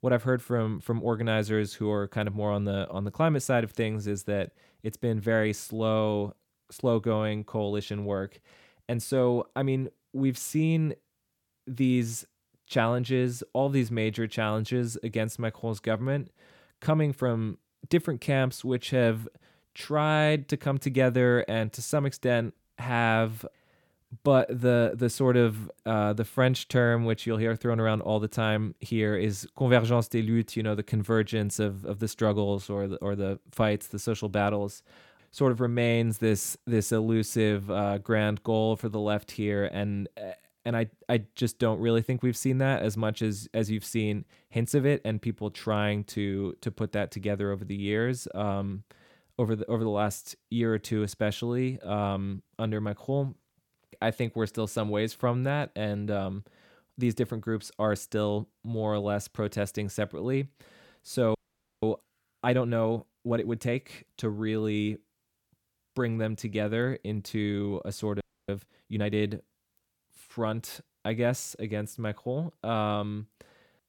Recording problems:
audio freezing; at 1:01 and at 1:08

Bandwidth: 17.5 kHz